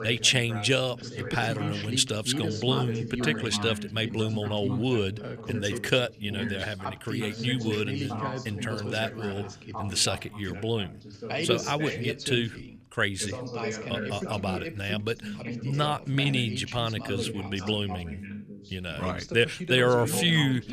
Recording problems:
background chatter; loud; throughout; 2 voices, 7 dB below the speech

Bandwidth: 14.5 kHz